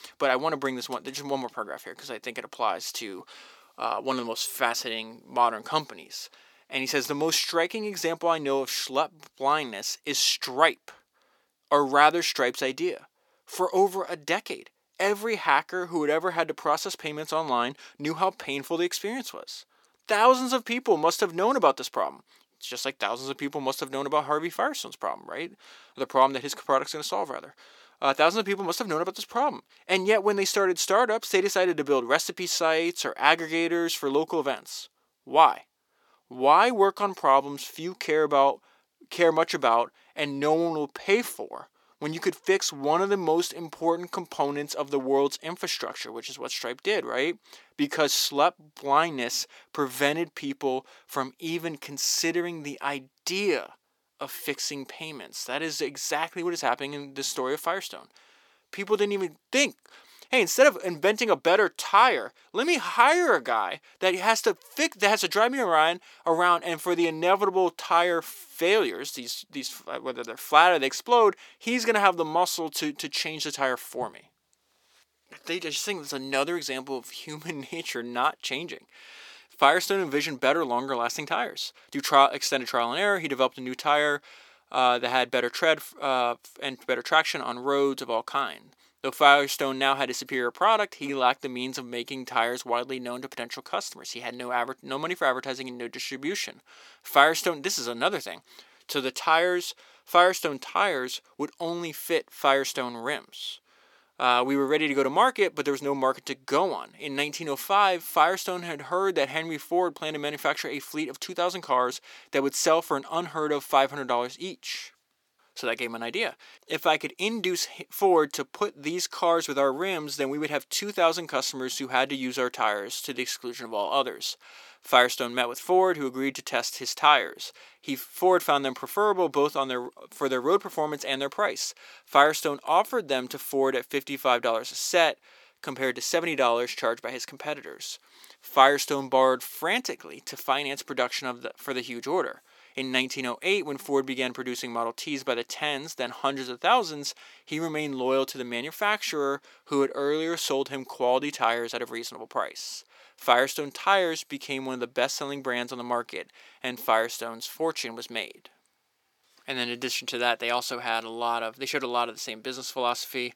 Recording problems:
thin; somewhat; fading below 450 Hz

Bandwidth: 18 kHz